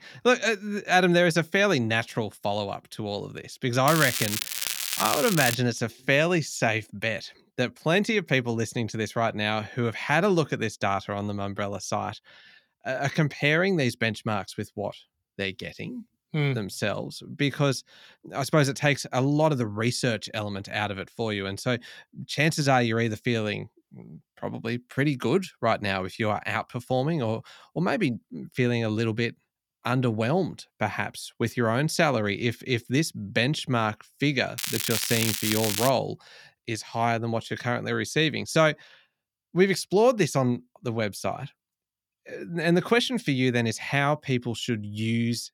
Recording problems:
crackling; loud; from 4 to 5.5 s and from 35 to 36 s; 1 dB below the speech

